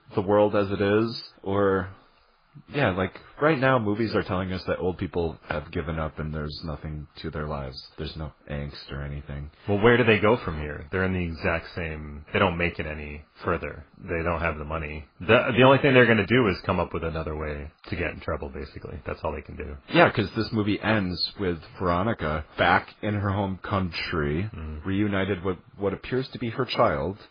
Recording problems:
garbled, watery; badly; nothing above 4 kHz

